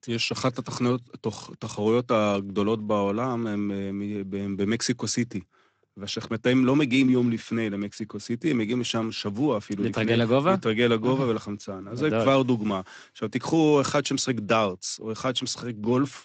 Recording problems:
garbled, watery; slightly; nothing above 8 kHz

